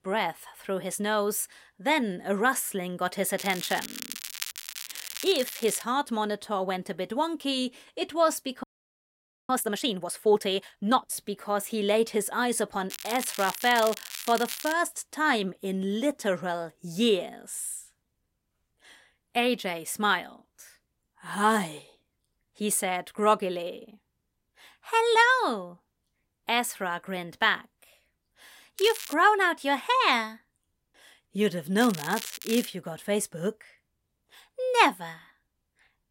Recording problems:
crackling; loud; 4 times, first at 3.5 s; 10 dB below the speech
audio freezing; at 8.5 s for 1 s

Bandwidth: 16 kHz